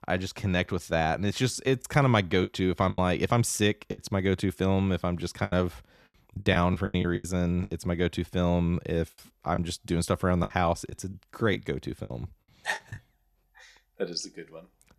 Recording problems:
choppy; very; from 2 to 4 s, from 5.5 to 7.5 s and from 9.5 to 13 s; 13% of the speech affected

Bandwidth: 14 kHz